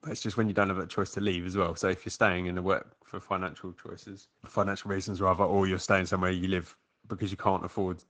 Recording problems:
garbled, watery; slightly

